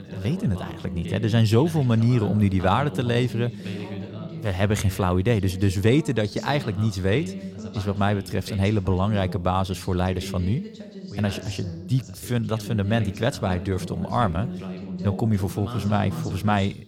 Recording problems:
background chatter; noticeable; throughout; 2 voices, 10 dB below the speech

